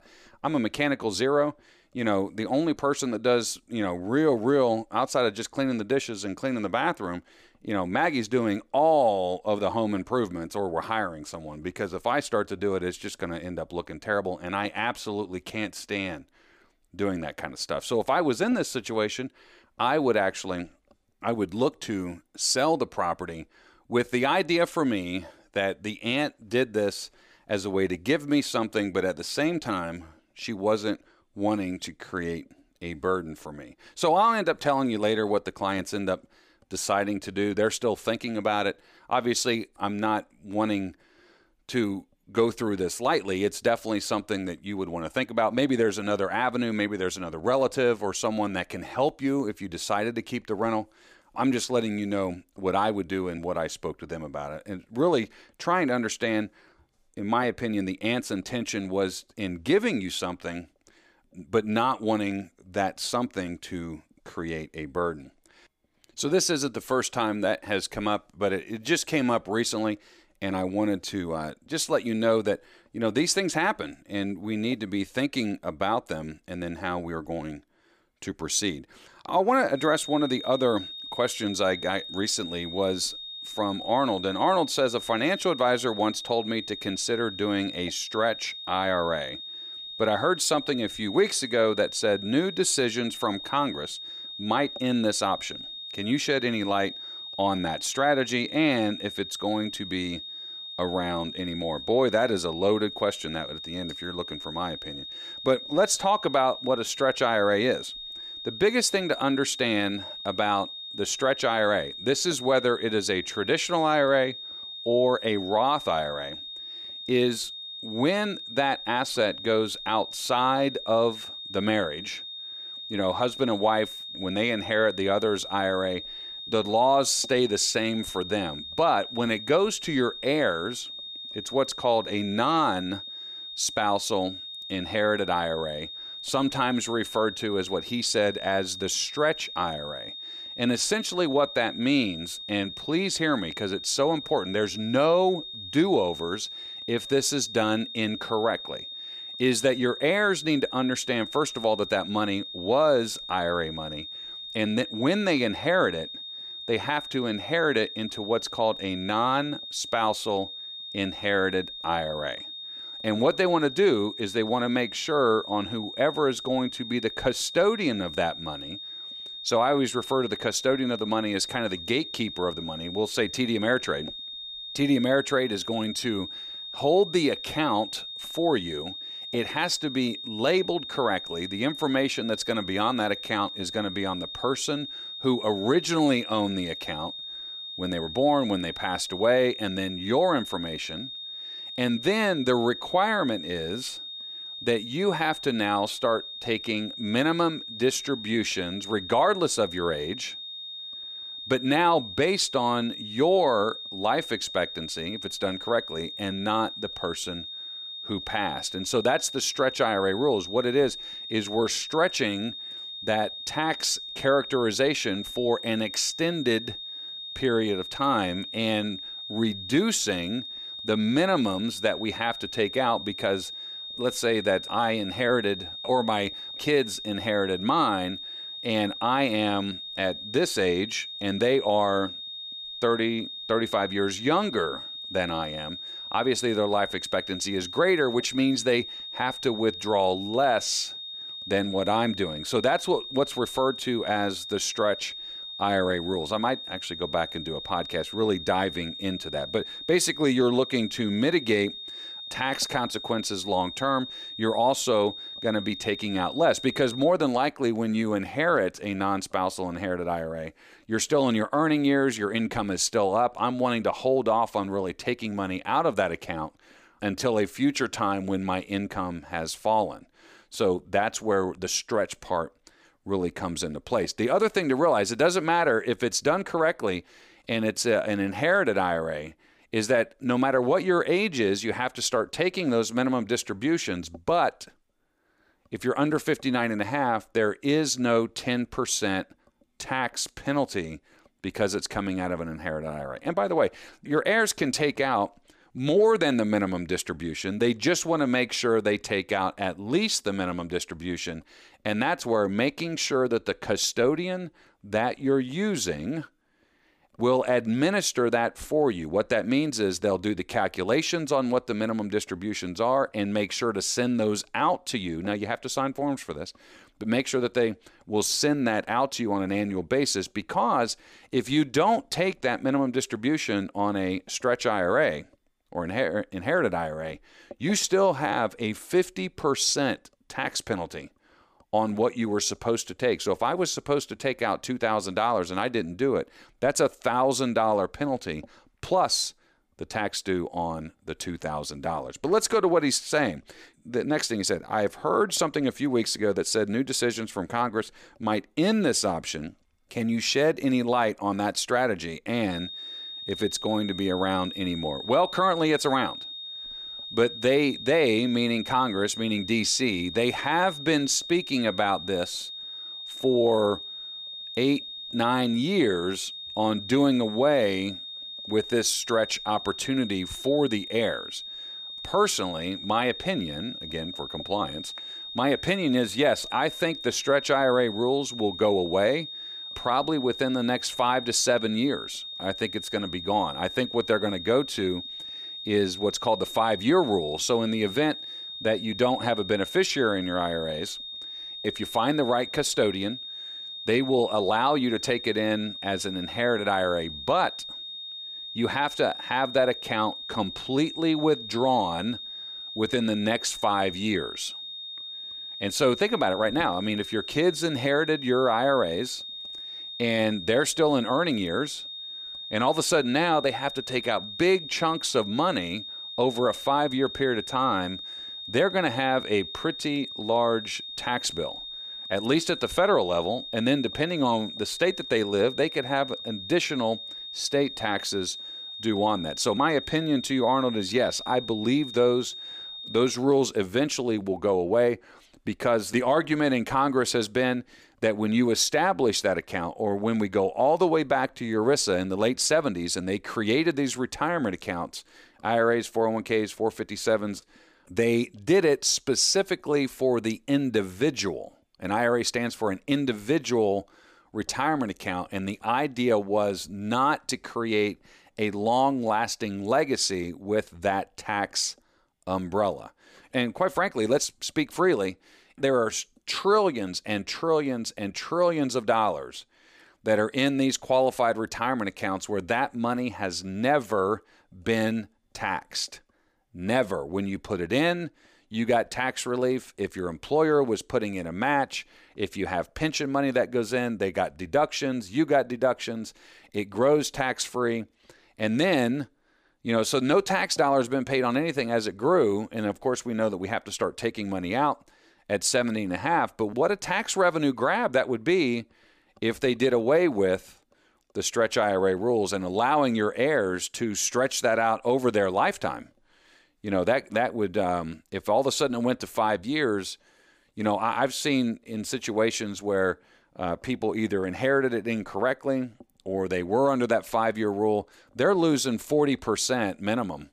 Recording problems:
high-pitched whine; loud; from 1:20 to 4:17 and from 5:53 to 7:13; 3.5 kHz, 9 dB below the speech

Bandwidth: 15 kHz